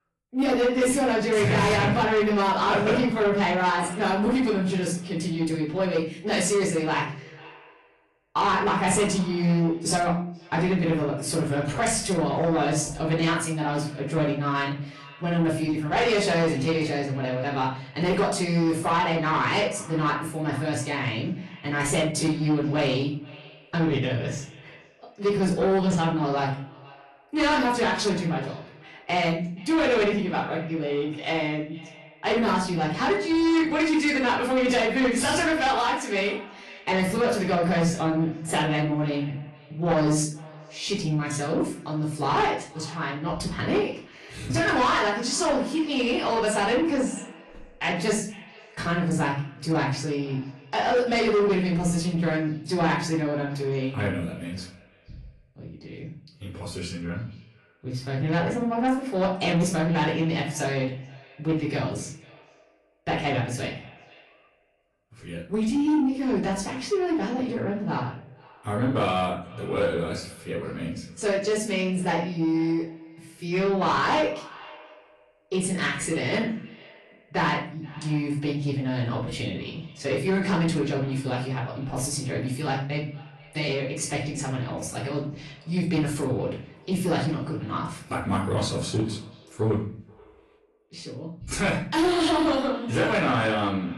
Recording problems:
off-mic speech; far
echo of what is said; faint; throughout; 480 ms later, 25 dB below the speech
room echo; slight; dies away in 0.4 s
distortion; slight; 10 dB below the speech
garbled, watery; slightly

